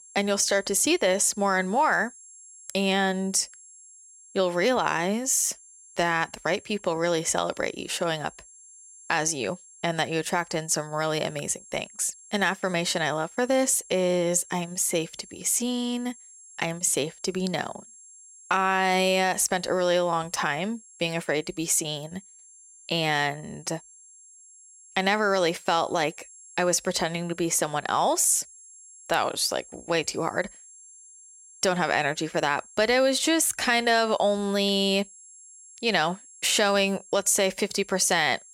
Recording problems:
high-pitched whine; faint; throughout; 7.5 kHz, 20 dB below the speech

